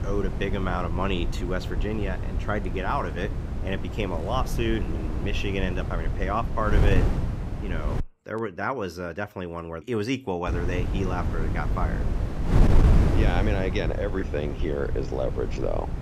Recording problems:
wind noise on the microphone; heavy; until 8 s and from 10 s on; 7 dB below the speech

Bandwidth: 15.5 kHz